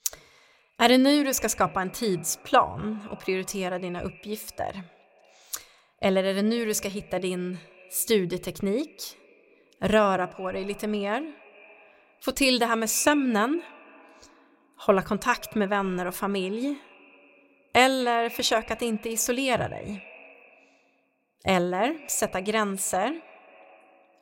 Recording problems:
echo of what is said; faint; throughout; 230 ms later, 20 dB below the speech

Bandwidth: 16 kHz